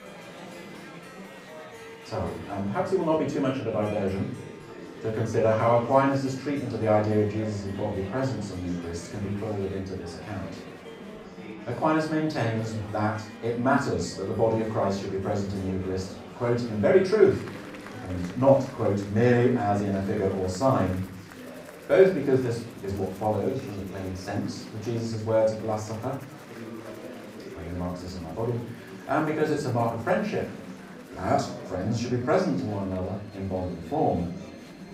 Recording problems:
off-mic speech; far
room echo; slight; dies away in 0.4 s
murmuring crowd; noticeable; throughout; 15 dB below the speech
background music; faint; throughout; 25 dB below the speech

